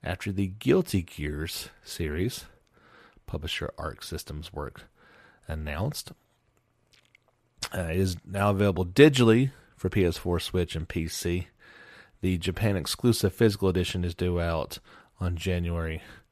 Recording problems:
none

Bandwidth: 14.5 kHz